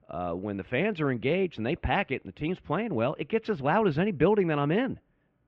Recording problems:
muffled; very; fading above 2.5 kHz

